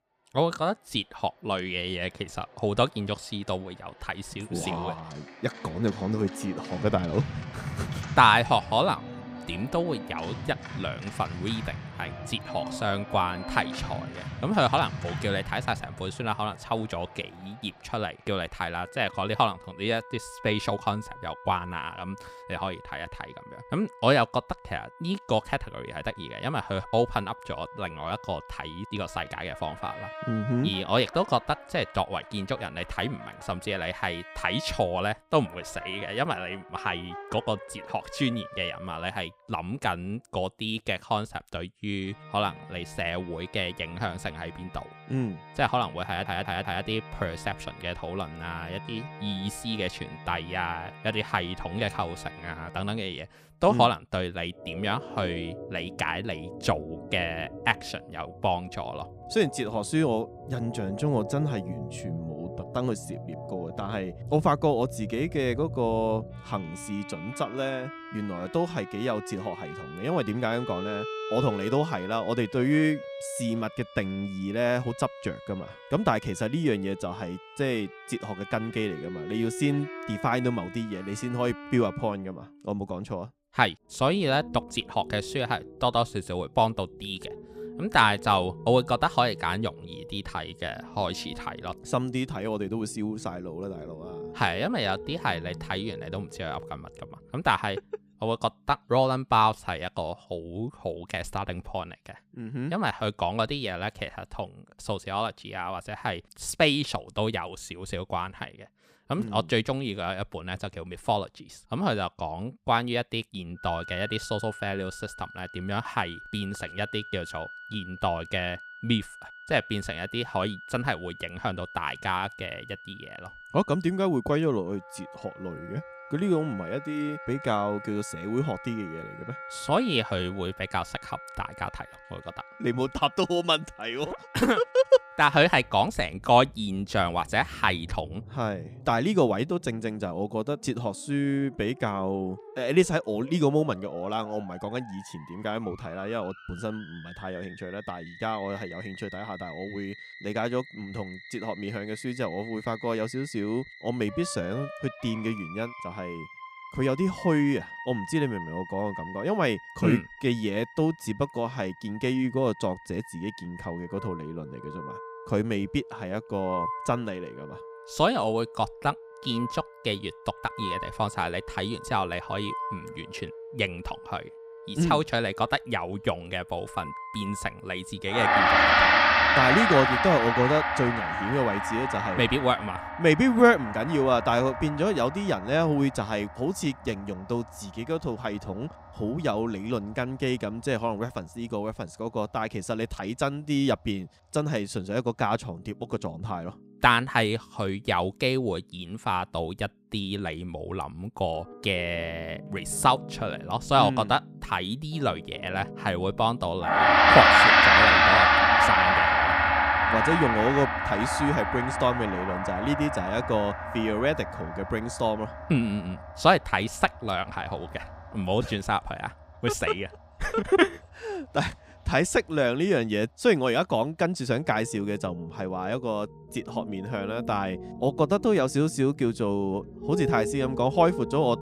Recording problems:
background music; loud; throughout; as loud as the speech
audio stuttering; at 46 s

